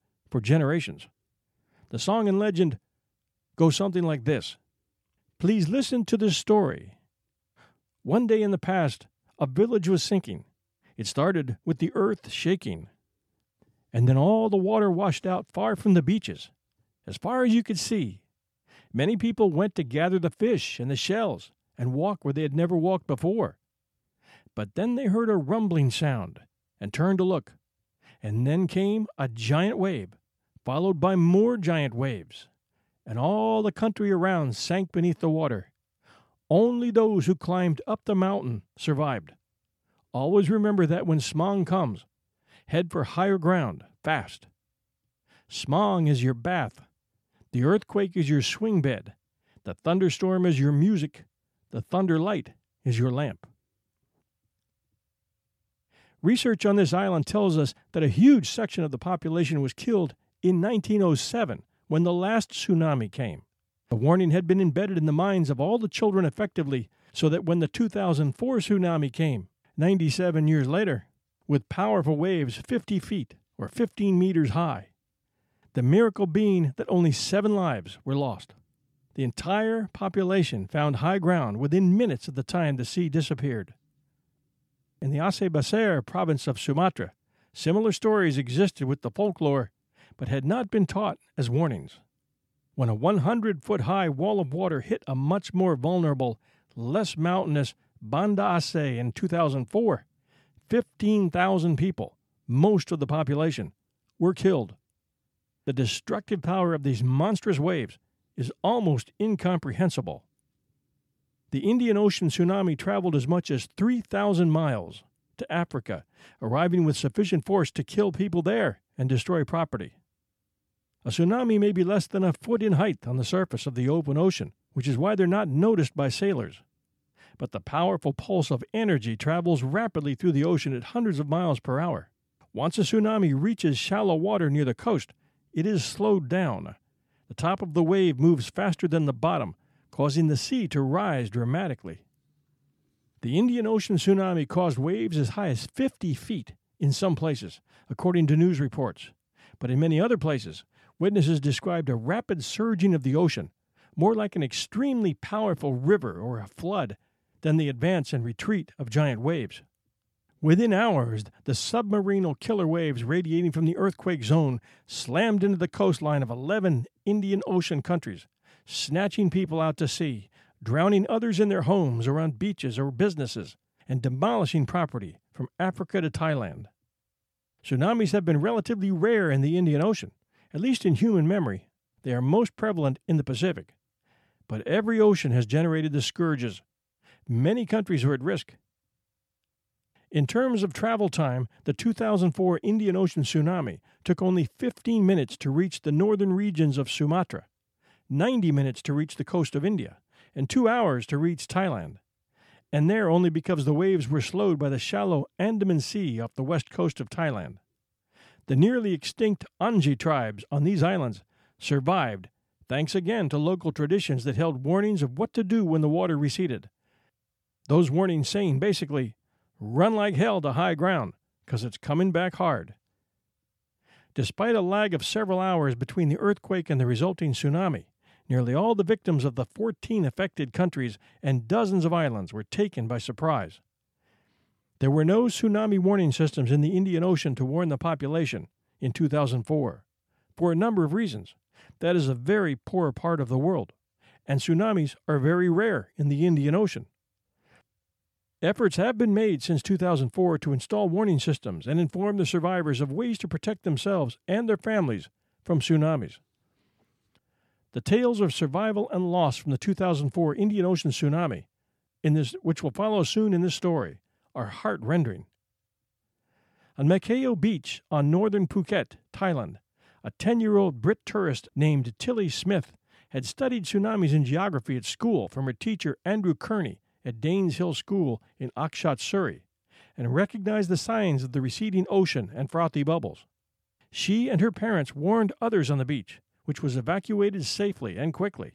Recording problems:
none

